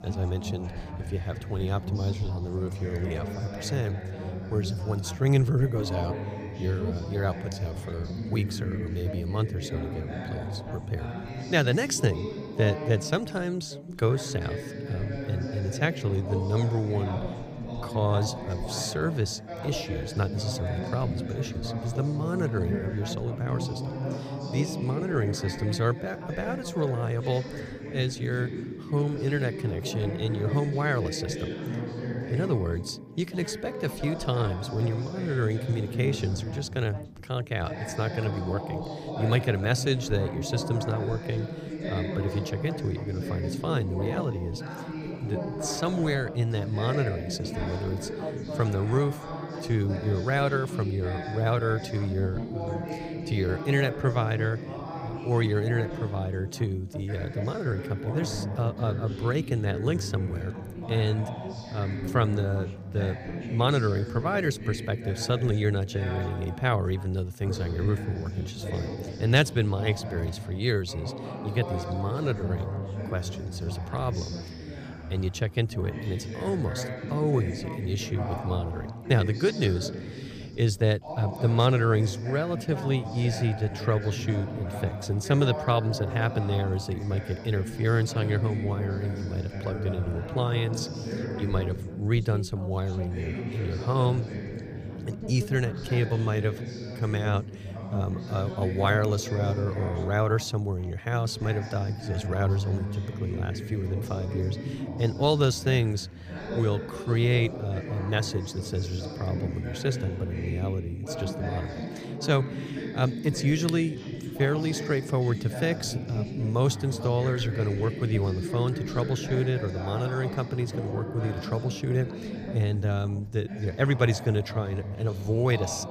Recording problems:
background chatter; loud; throughout; 2 voices, 7 dB below the speech

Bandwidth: 15 kHz